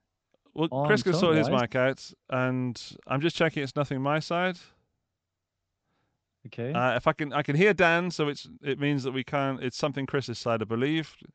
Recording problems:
high frequencies cut off; noticeable; nothing above 8 kHz

